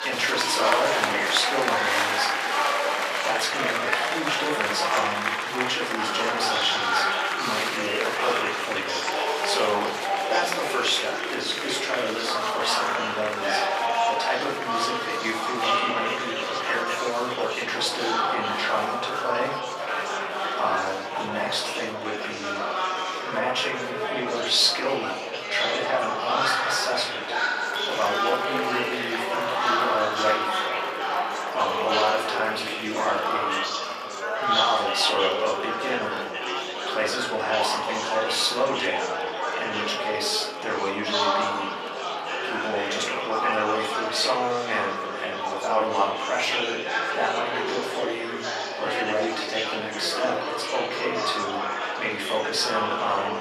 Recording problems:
off-mic speech; far
thin; very; fading below 600 Hz
room echo; slight; dies away in 0.5 s
murmuring crowd; very loud; throughout; 1 dB above the speech

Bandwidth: 14.5 kHz